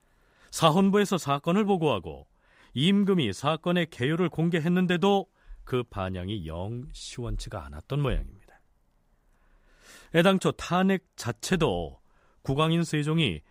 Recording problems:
none

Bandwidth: 15.5 kHz